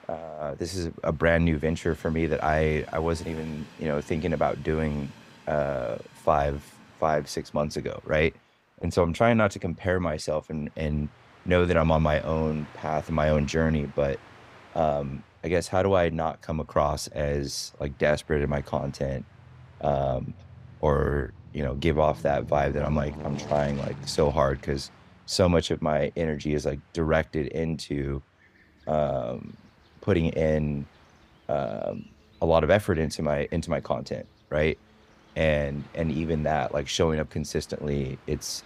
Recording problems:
train or aircraft noise; faint; throughout; 20 dB below the speech

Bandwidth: 15.5 kHz